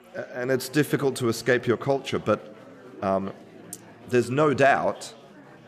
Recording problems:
chatter from many people; faint; throughout; 20 dB below the speech

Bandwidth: 14.5 kHz